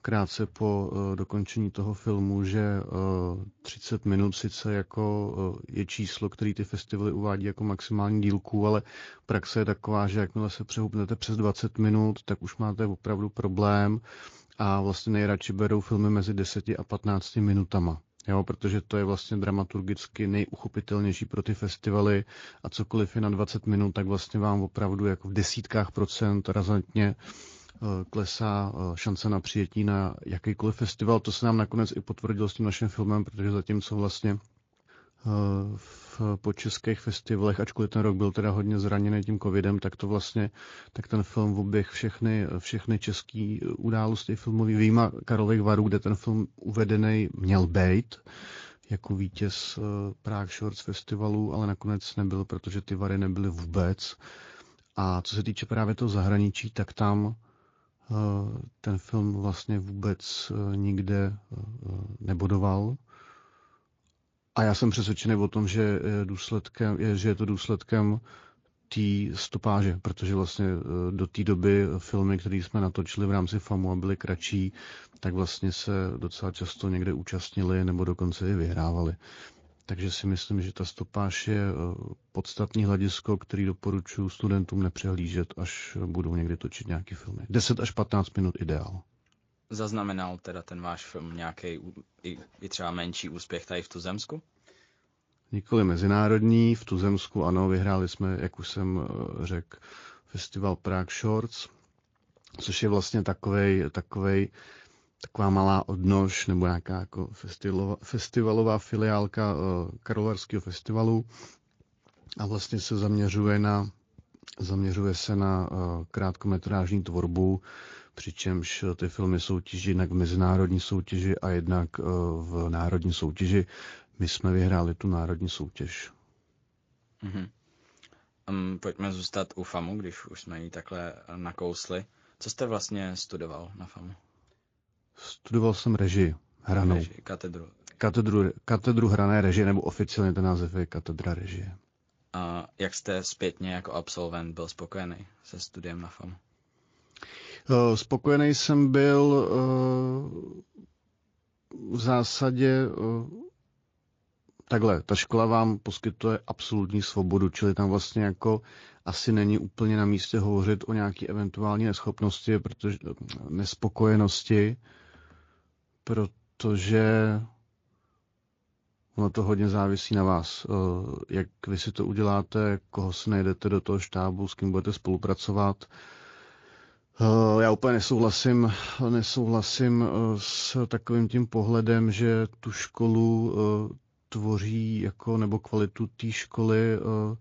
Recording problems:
garbled, watery; slightly; nothing above 17 kHz

